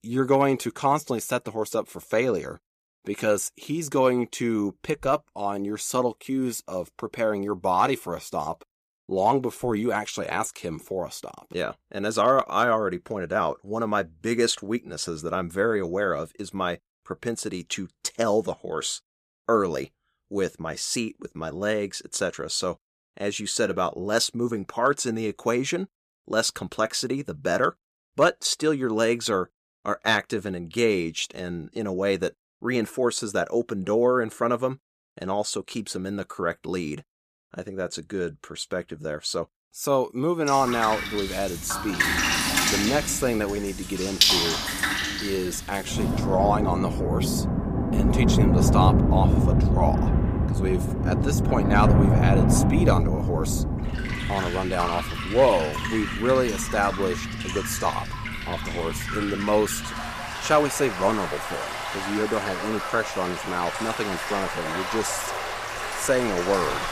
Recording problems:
rain or running water; very loud; from 41 s on; 1 dB above the speech

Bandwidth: 14.5 kHz